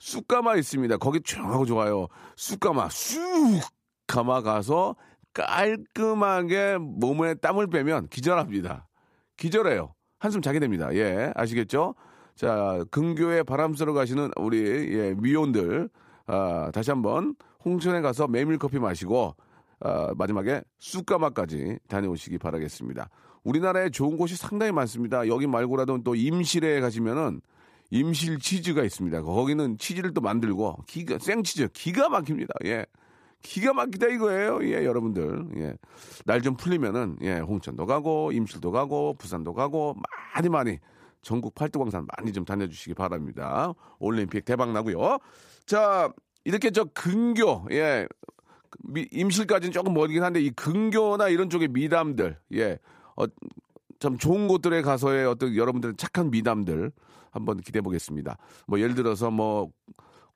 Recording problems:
uneven, jittery; strongly; from 5 to 59 s

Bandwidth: 15 kHz